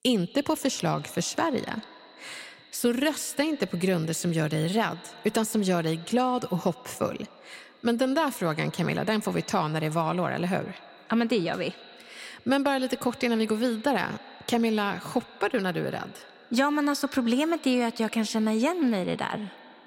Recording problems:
echo of what is said; faint; throughout; 130 ms later, 20 dB below the speech

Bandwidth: 16 kHz